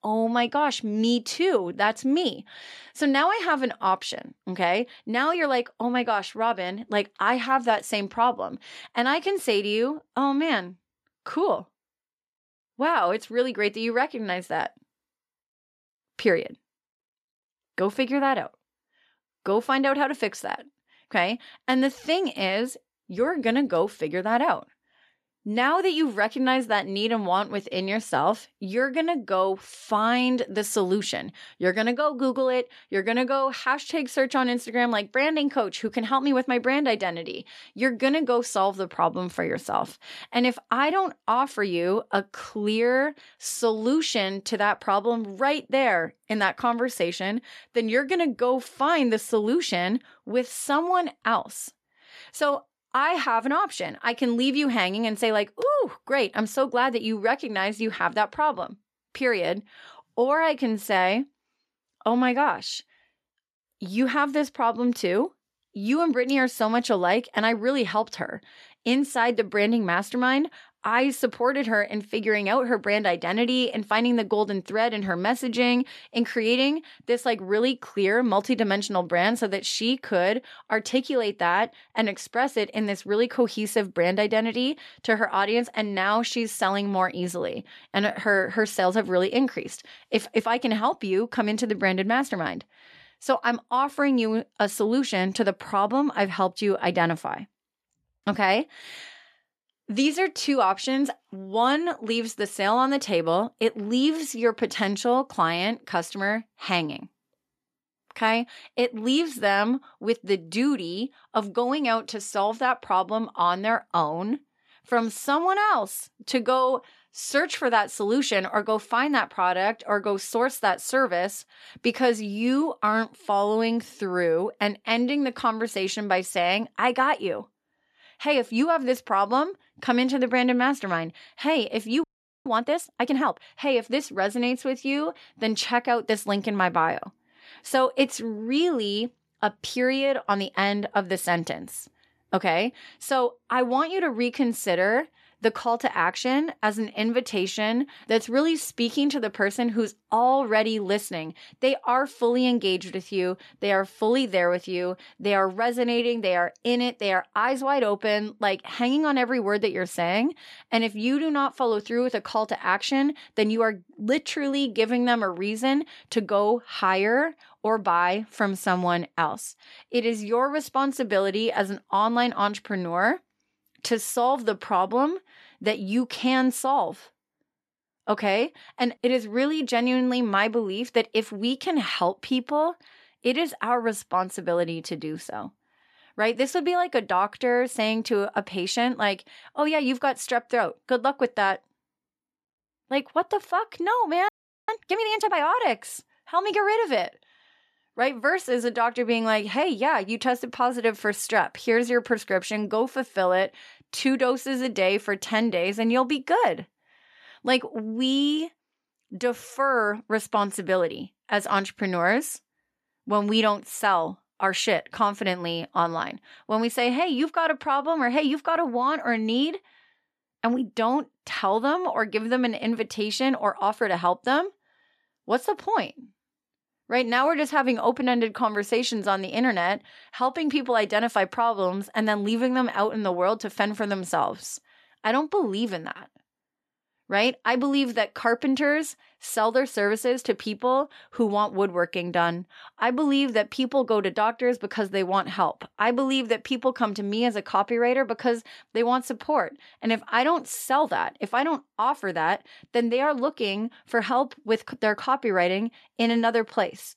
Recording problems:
audio freezing; at 2:12 and at 3:14

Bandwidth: 13.5 kHz